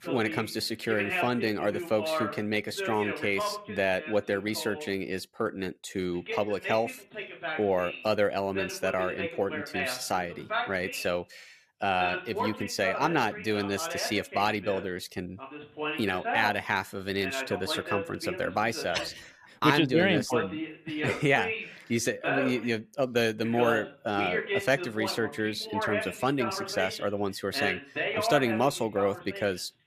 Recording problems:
voice in the background; loud; throughout; 5 dB below the speech

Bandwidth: 14.5 kHz